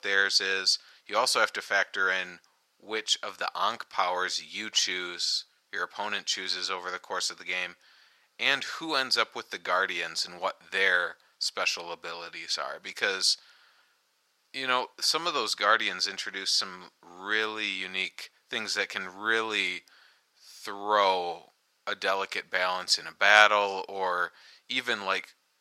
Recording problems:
thin; very; fading below 800 Hz

